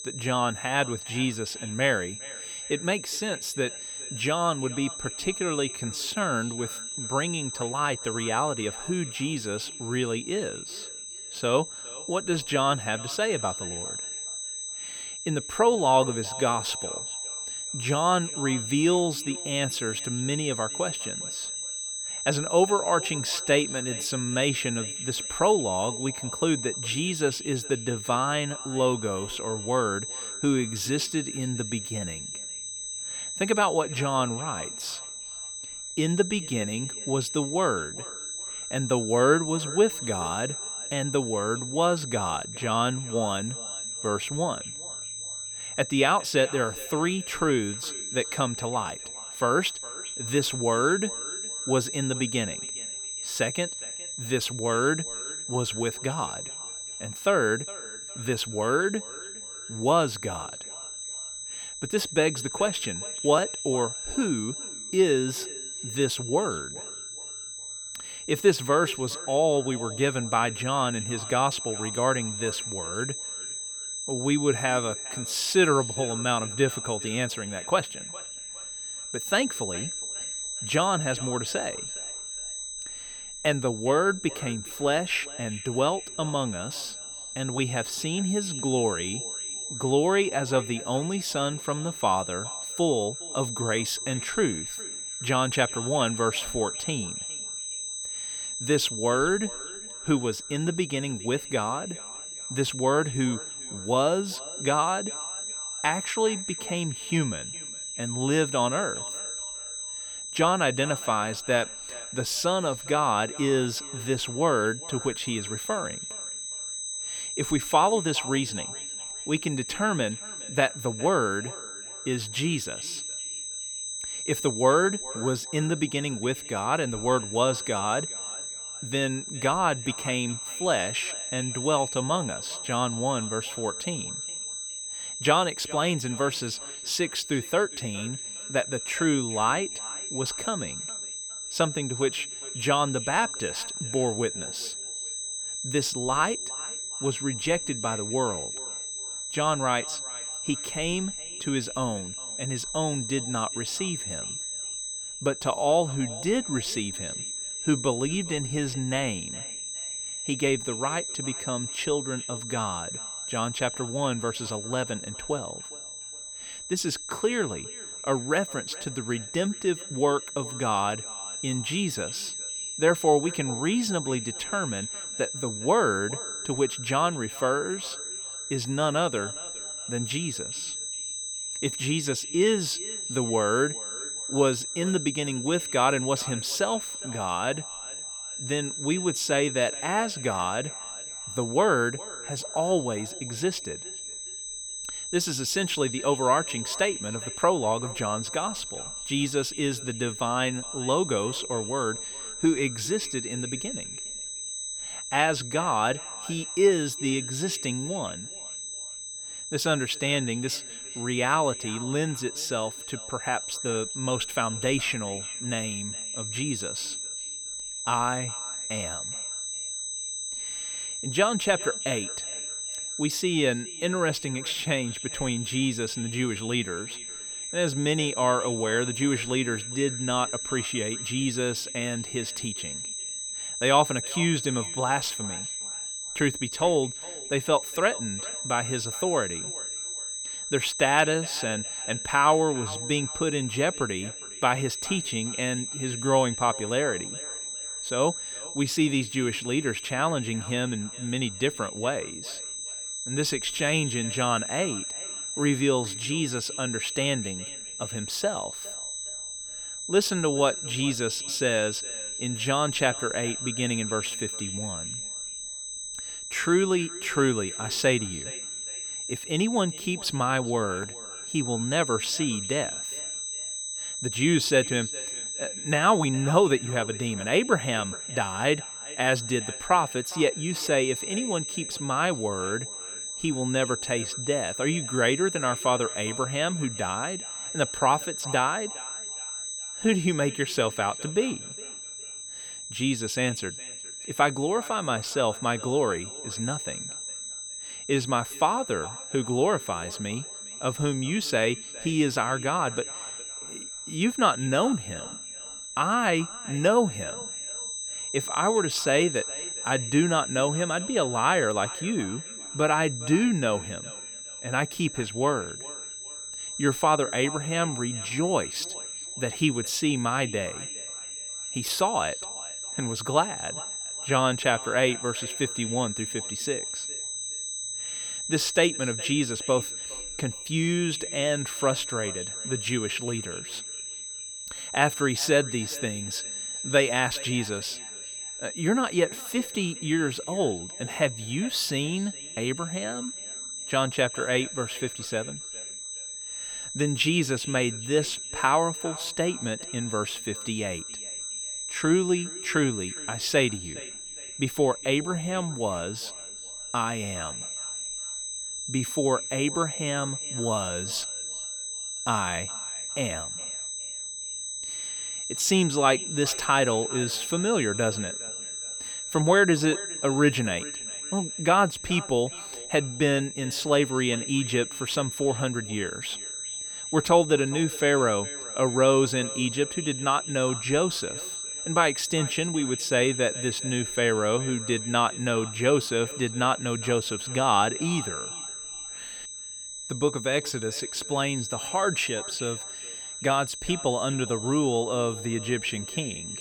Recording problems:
echo of what is said; faint; throughout; 410 ms later, 20 dB below the speech
high-pitched whine; loud; throughout; 8 kHz, 6 dB below the speech

